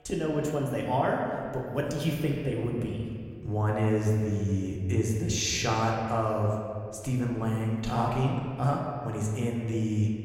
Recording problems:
room echo; noticeable; dies away in 2 s
off-mic speech; somewhat distant

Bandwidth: 16 kHz